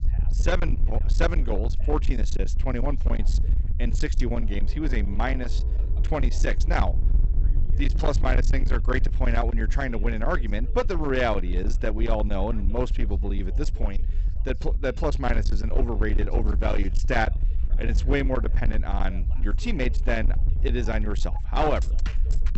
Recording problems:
high frequencies cut off; noticeable; nothing above 8 kHz
distortion; slight; 18% of the sound clipped
low rumble; noticeable; throughout; 10 dB below the speech
background music; faint; from 4.5 s on; 20 dB below the speech
voice in the background; faint; throughout; 25 dB below the speech

